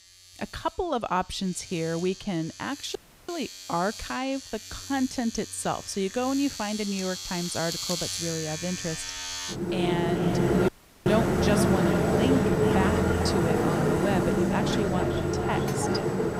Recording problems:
echo of what is said; strong; from 10 s on; 440 ms later, 10 dB below the speech
household noises; very loud; throughout; 4 dB above the speech
audio cutting out; at 3 s and at 11 s

